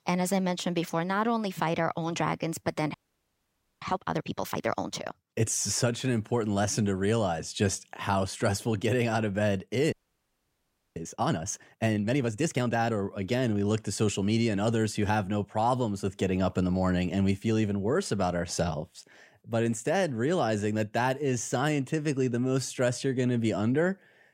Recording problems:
audio freezing; at 3 s for 1 s and at 10 s for 1 s

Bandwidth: 16 kHz